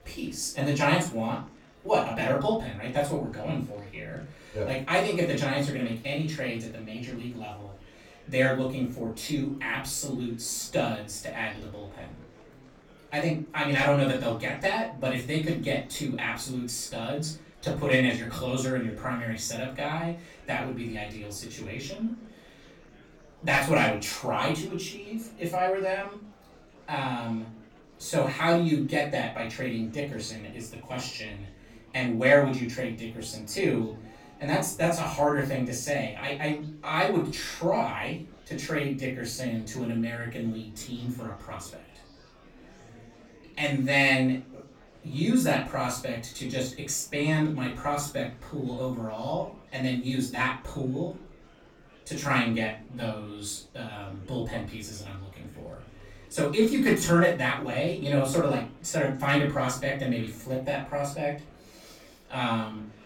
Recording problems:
off-mic speech; far
room echo; slight; dies away in 0.3 s
murmuring crowd; faint; throughout; 25 dB below the speech

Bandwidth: 17 kHz